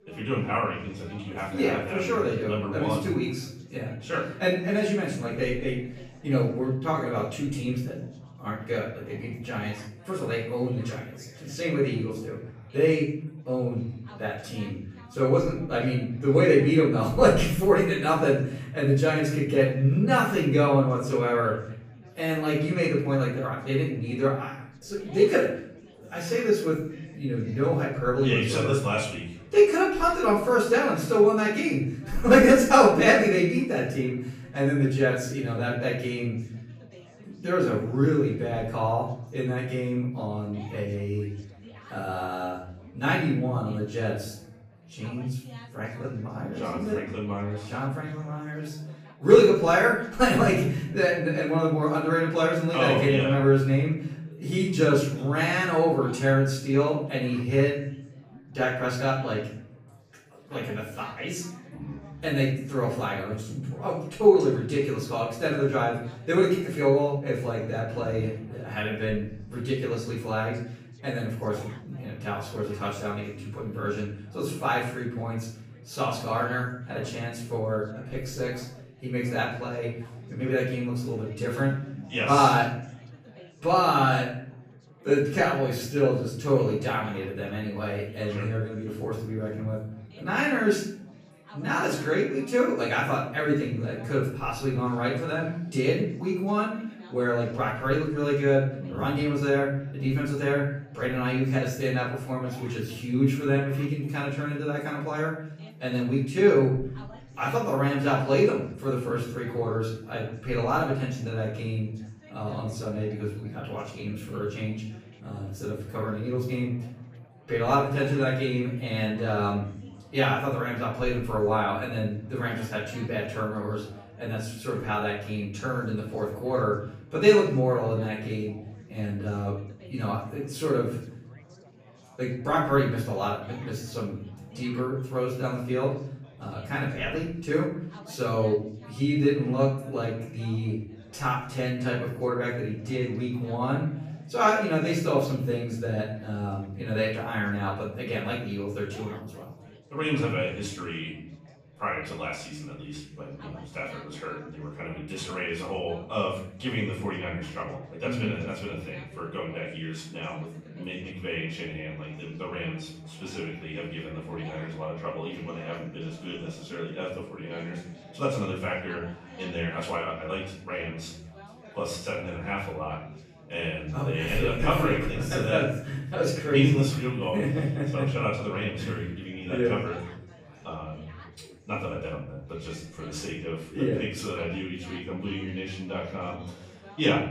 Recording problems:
off-mic speech; far
room echo; noticeable; dies away in 0.9 s
chatter from many people; faint; throughout; 25 dB below the speech

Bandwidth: 15 kHz